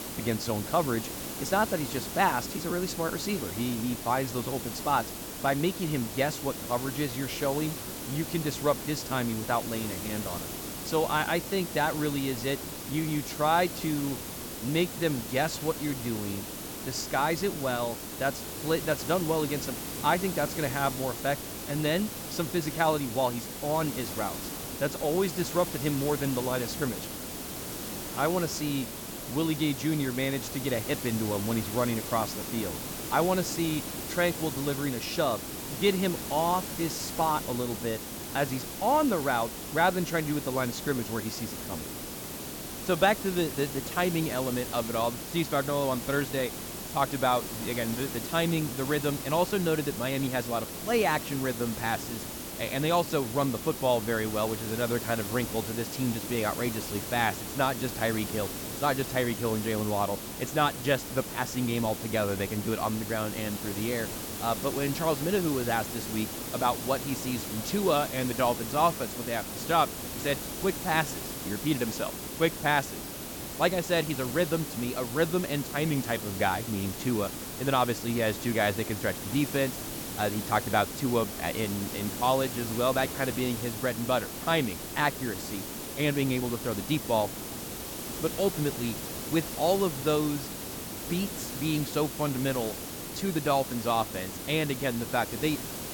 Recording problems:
hiss; loud; throughout; 6 dB below the speech

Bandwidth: 17.5 kHz